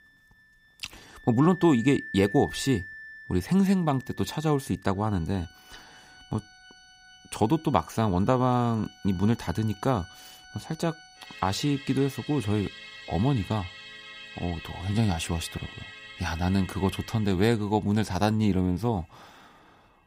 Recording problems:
background music; noticeable; throughout; 15 dB below the speech

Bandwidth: 15.5 kHz